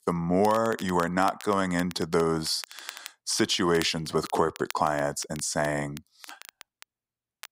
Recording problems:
crackle, like an old record; noticeable; 20 dB below the speech

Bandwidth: 15.5 kHz